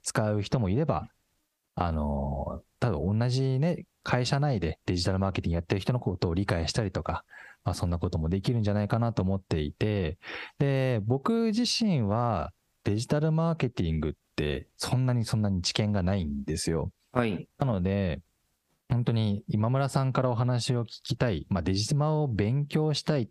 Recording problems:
squashed, flat; heavily

